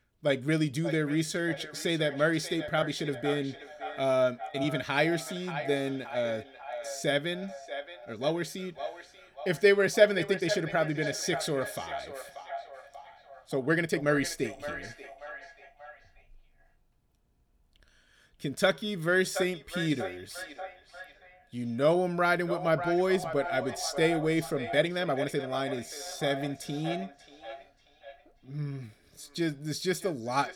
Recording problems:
echo of what is said; strong; throughout; 590 ms later, 10 dB below the speech
uneven, jittery; strongly; from 1 to 30 s

